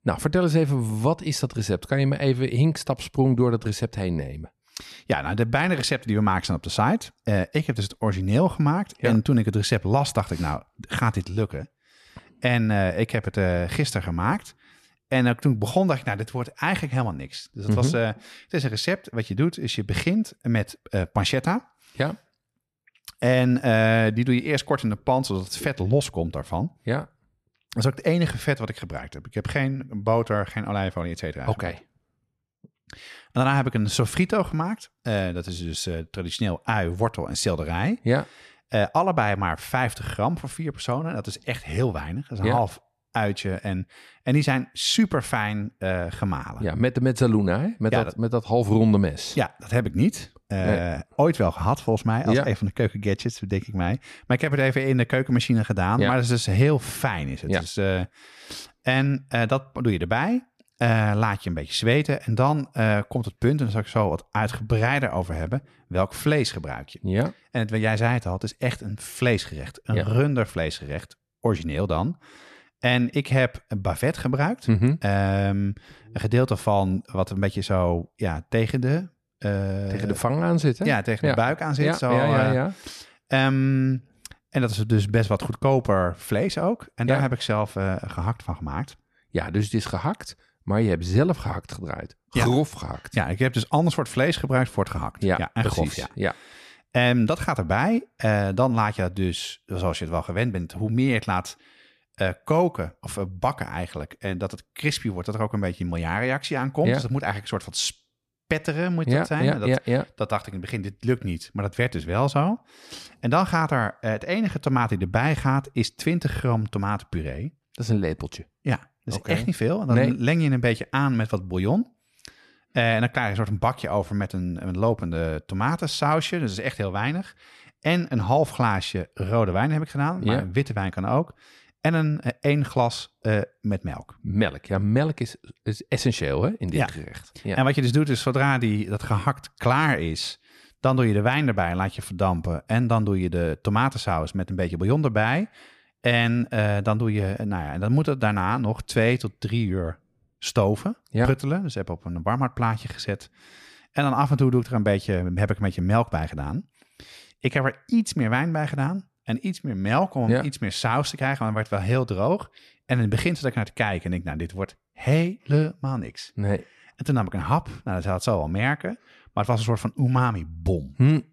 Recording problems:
none

